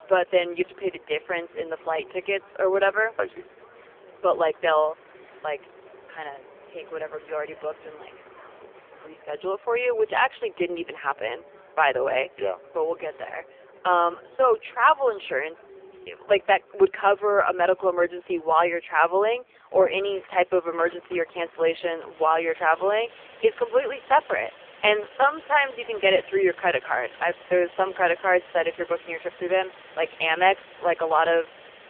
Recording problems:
phone-call audio; poor line; nothing above 3 kHz
traffic noise; faint; throughout; 25 dB below the speech

